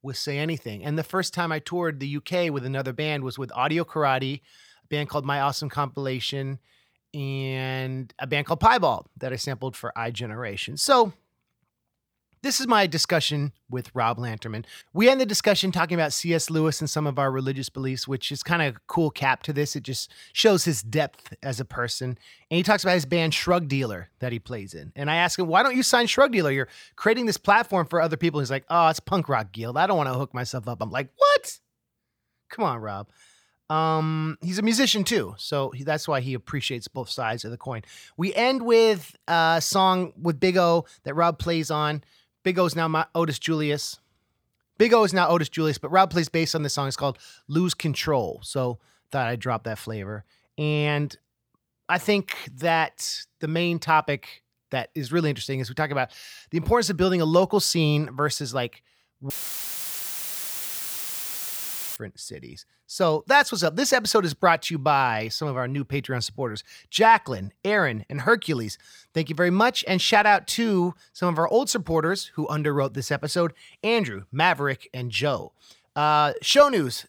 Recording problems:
audio cutting out; filled with static; at 59 s for 2.5 s

